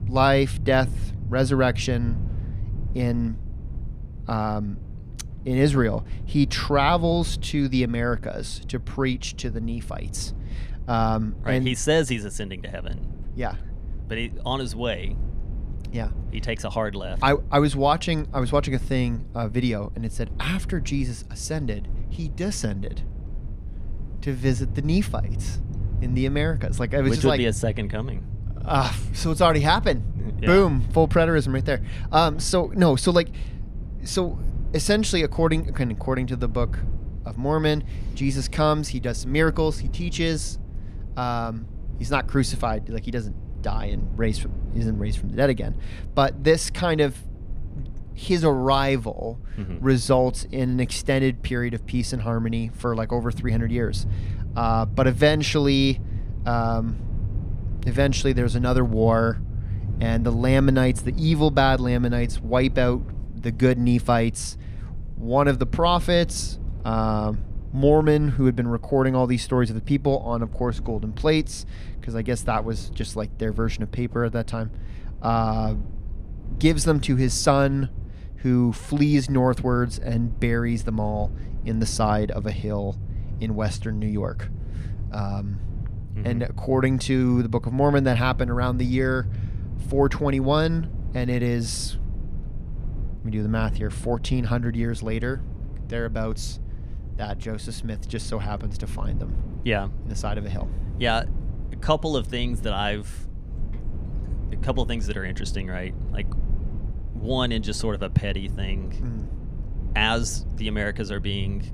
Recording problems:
low rumble; faint; throughout; 20 dB below the speech

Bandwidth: 14.5 kHz